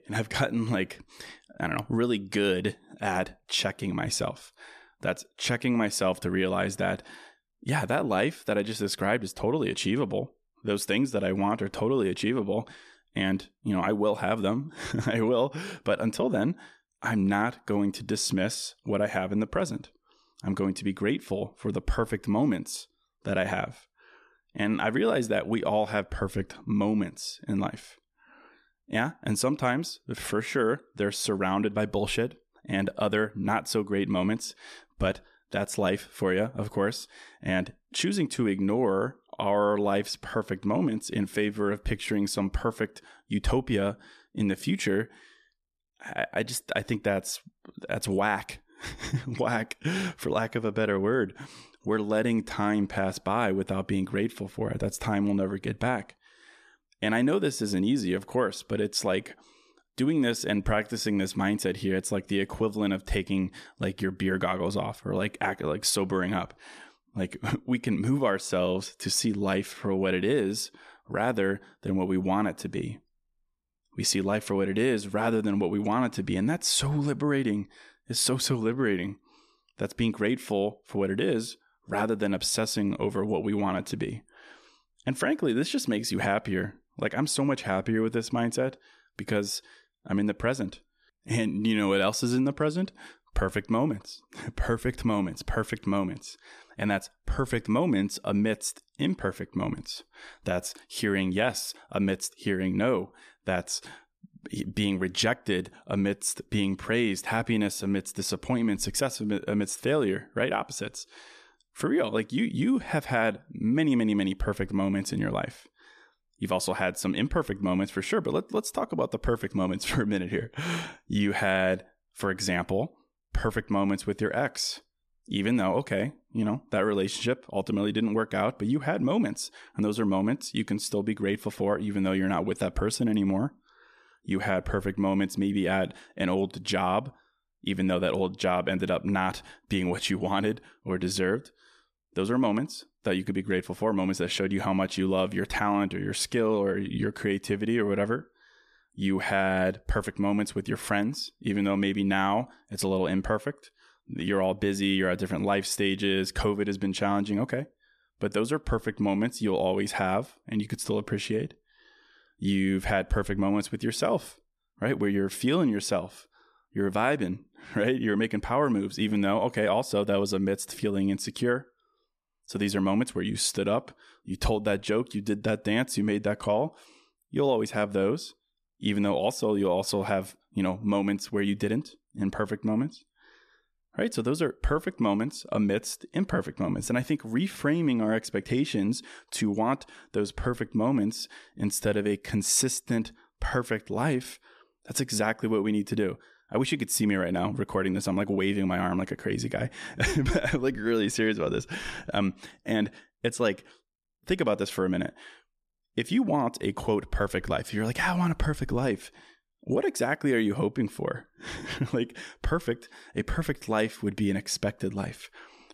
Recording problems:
none

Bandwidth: 14 kHz